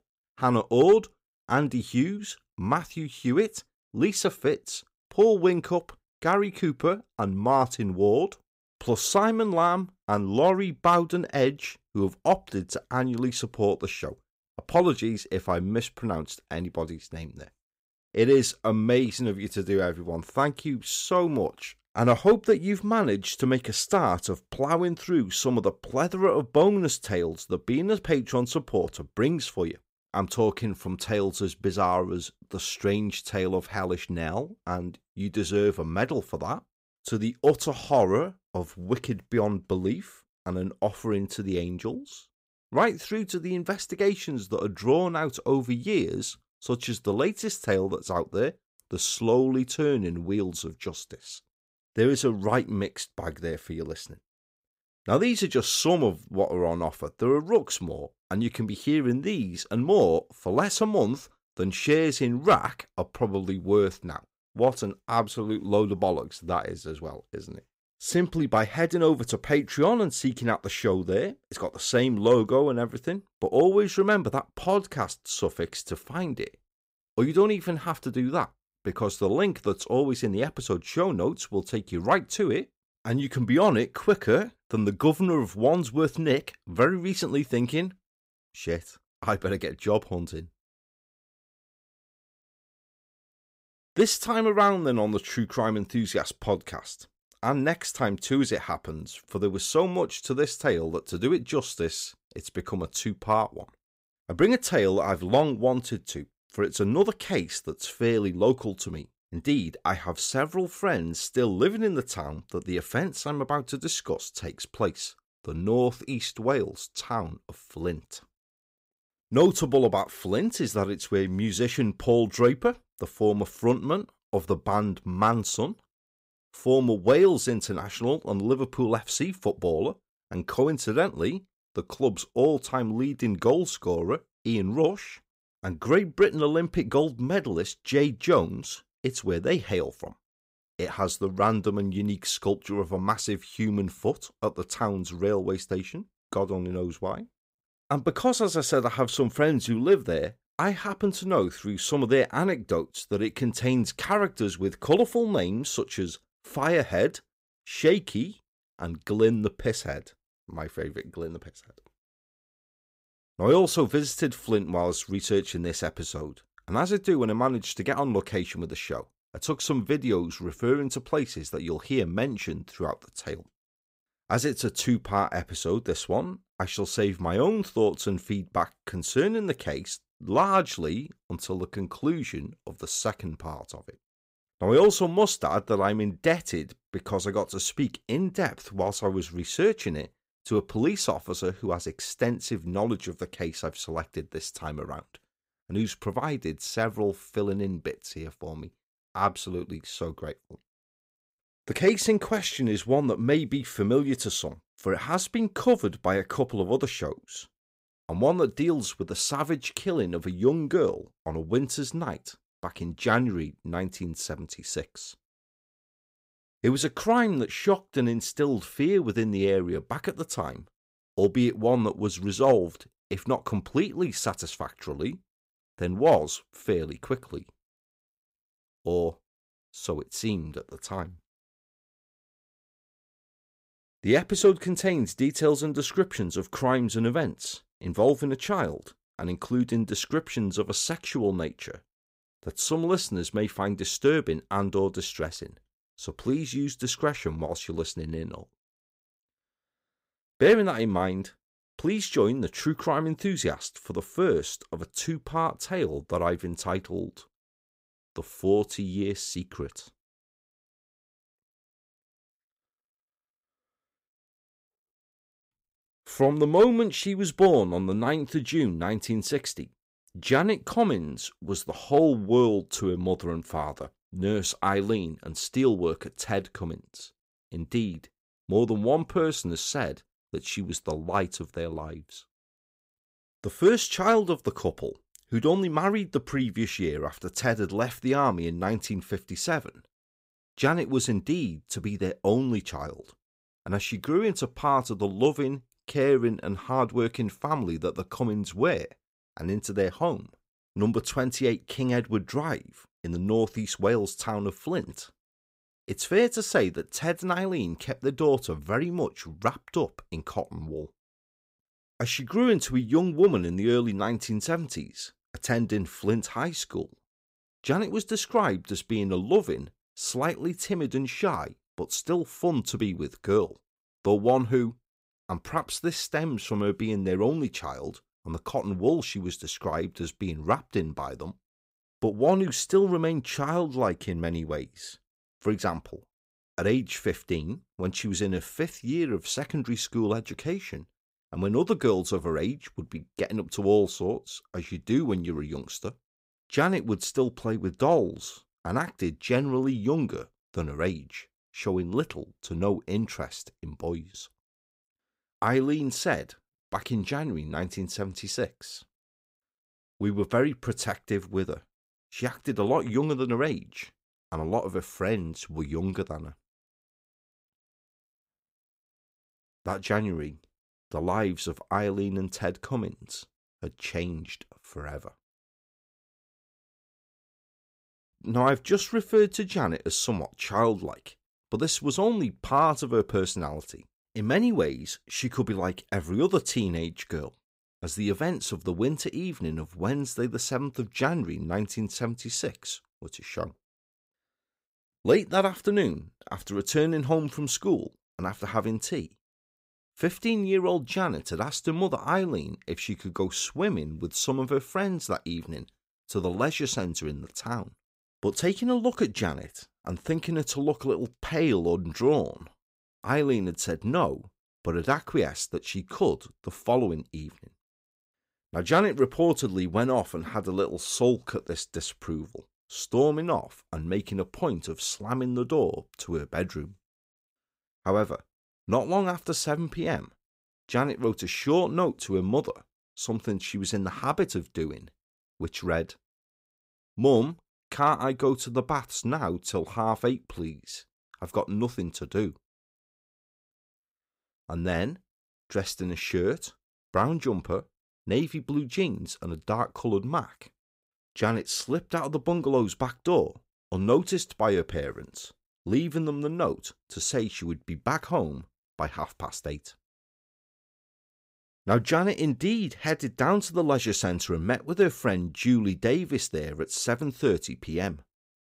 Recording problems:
none

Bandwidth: 15.5 kHz